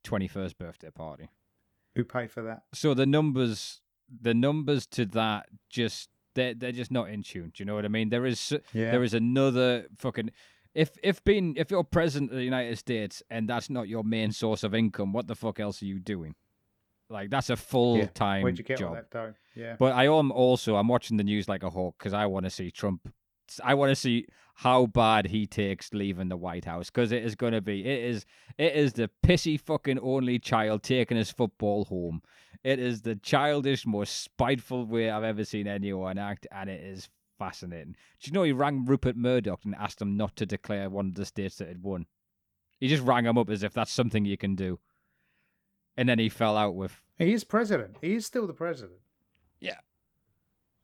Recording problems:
none

